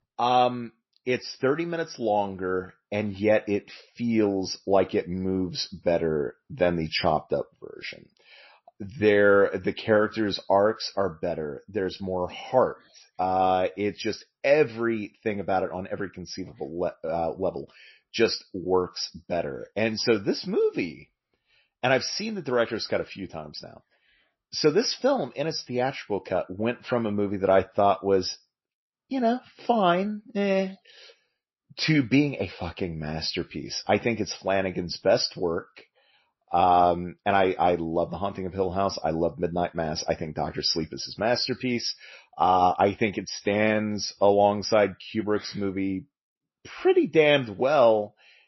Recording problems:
garbled, watery; slightly; nothing above 5.5 kHz

